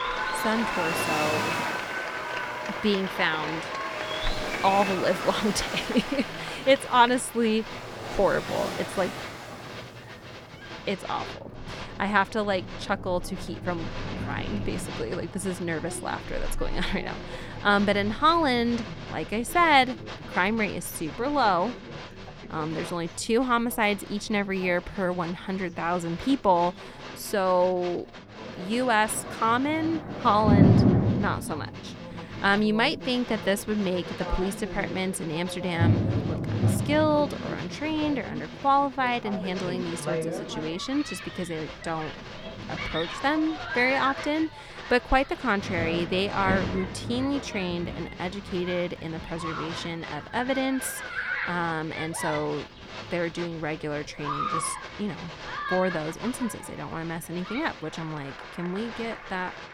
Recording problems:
crowd noise; loud; throughout; 9 dB below the speech
rain or running water; loud; throughout; 4 dB below the speech

